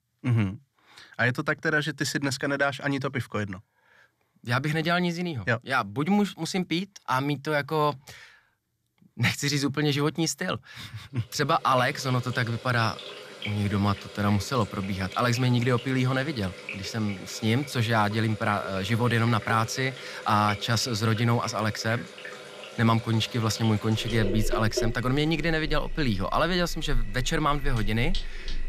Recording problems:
household noises; noticeable; from 12 s on; 10 dB below the speech

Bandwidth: 14.5 kHz